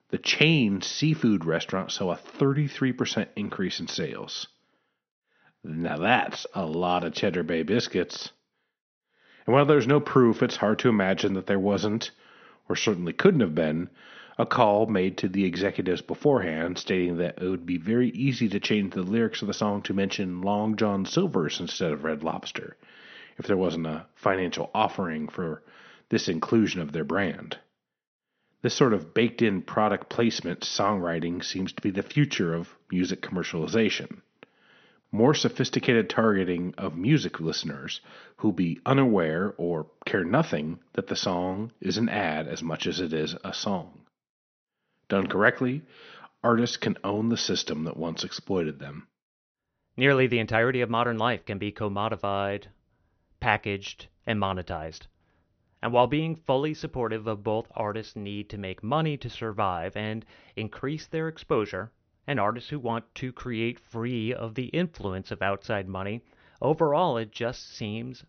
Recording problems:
high frequencies cut off; noticeable; nothing above 6 kHz

